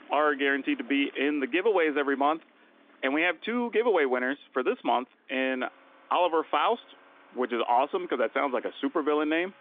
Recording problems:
phone-call audio; nothing above 3.5 kHz
traffic noise; faint; throughout; 25 dB below the speech

